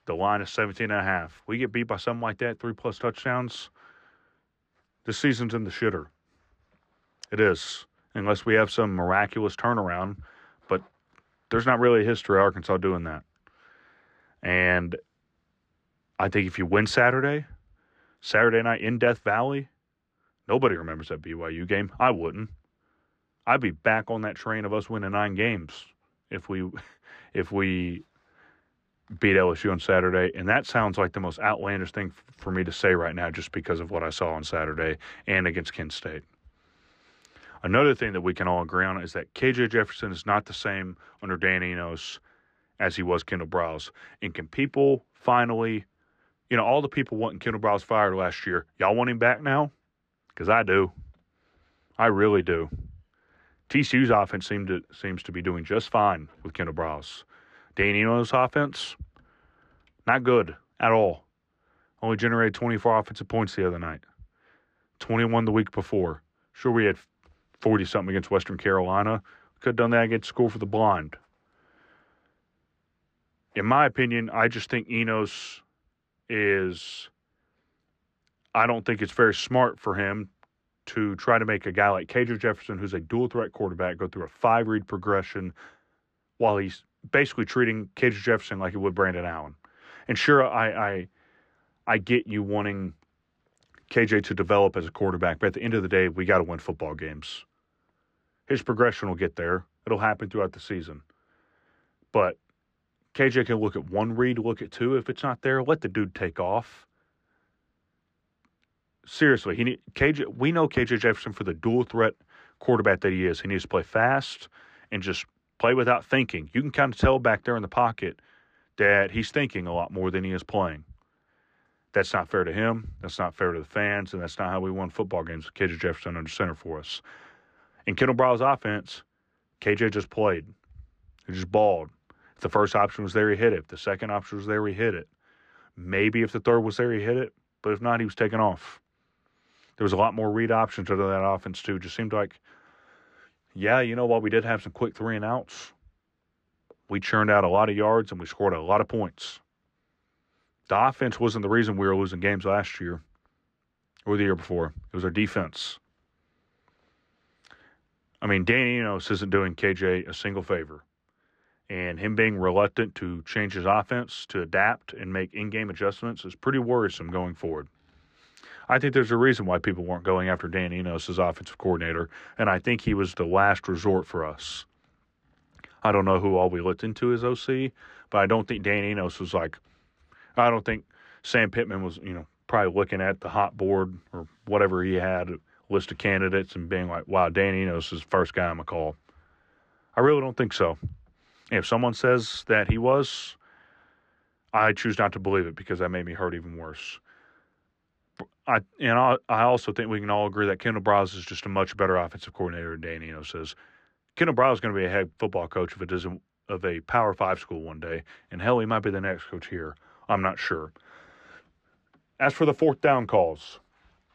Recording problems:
muffled; very slightly; fading above 4.5 kHz

